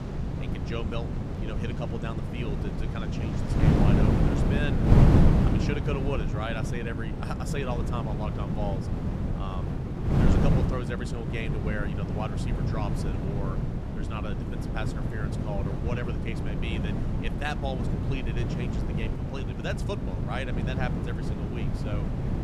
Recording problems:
wind noise on the microphone; heavy; 1 dB above the speech
rain or running water; noticeable; until 4.5 s; 15 dB below the speech
low rumble; very faint; from 10 s on; 25 dB below the speech

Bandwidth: 14.5 kHz